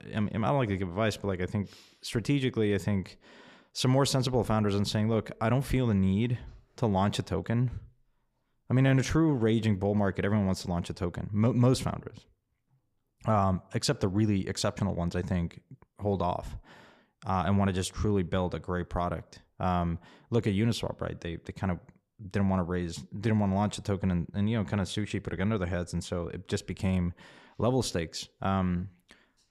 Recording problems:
none

